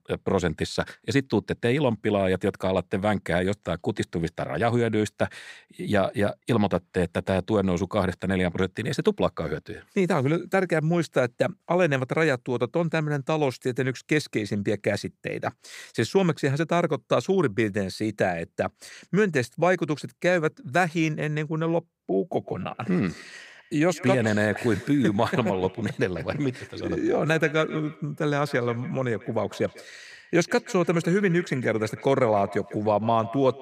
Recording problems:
echo of what is said; faint; from 22 s on; 150 ms later, 20 dB below the speech

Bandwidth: 15.5 kHz